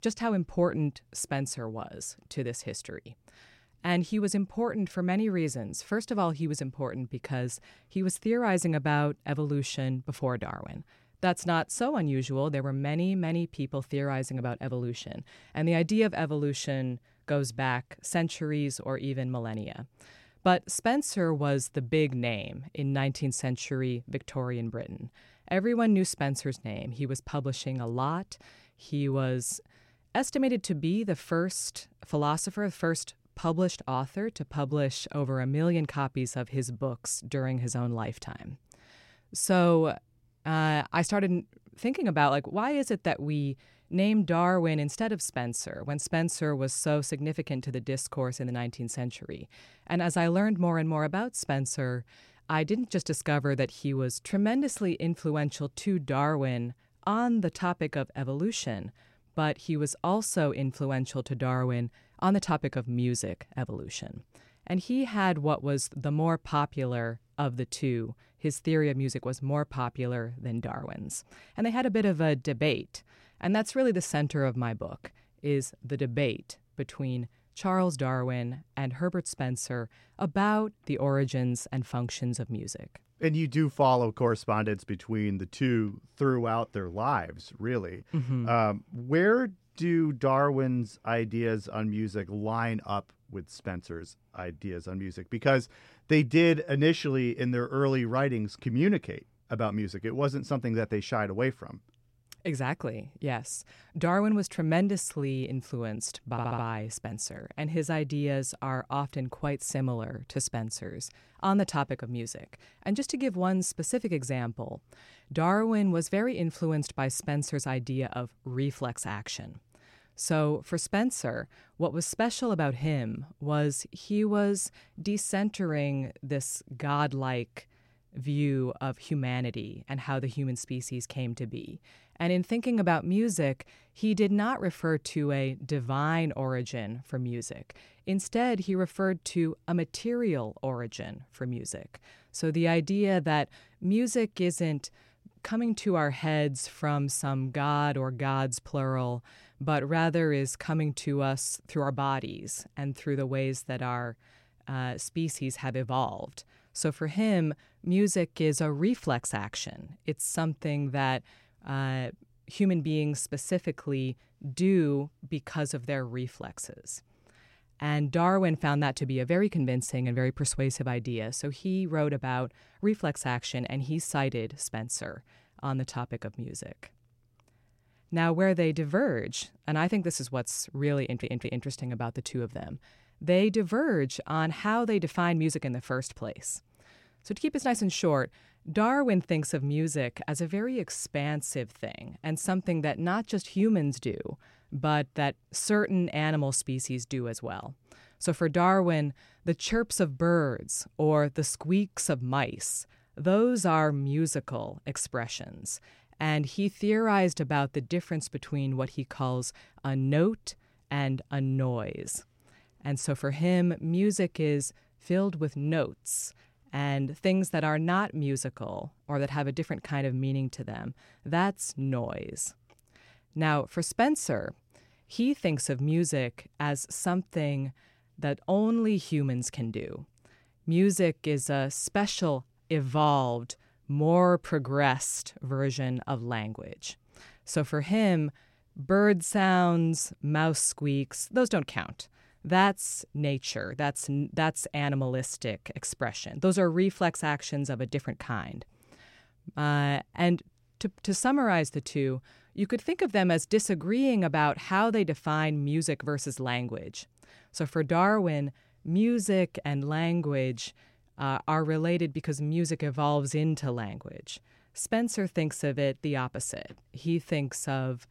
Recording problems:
audio stuttering; at 1:46 and at 3:01

